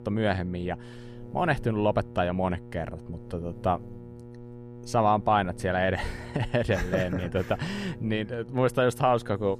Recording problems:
electrical hum; faint; throughout; 60 Hz, 20 dB below the speech

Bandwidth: 14.5 kHz